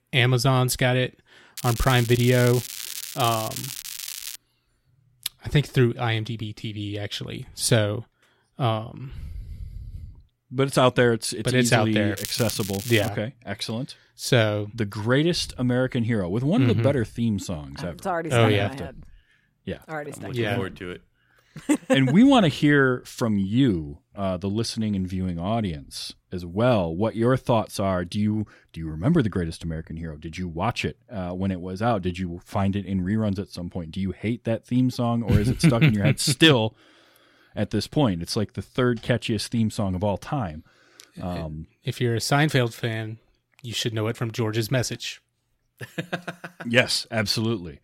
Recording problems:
crackling; loud; from 1.5 to 4.5 s and at 12 s; 9 dB below the speech

